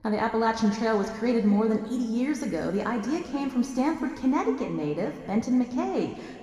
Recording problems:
room echo; noticeable; dies away in 2.1 s
off-mic speech; somewhat distant

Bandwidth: 15 kHz